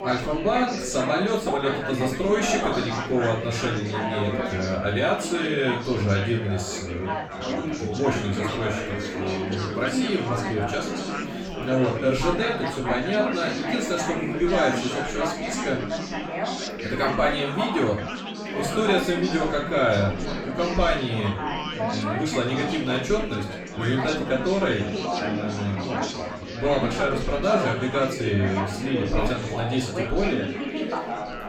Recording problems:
off-mic speech; far
room echo; noticeable; dies away in 0.3 s
chatter from many people; loud; throughout; 3 dB below the speech

